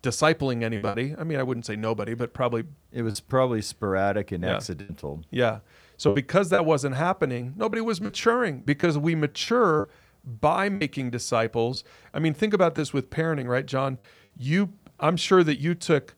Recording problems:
choppy; occasionally; 4% of the speech affected

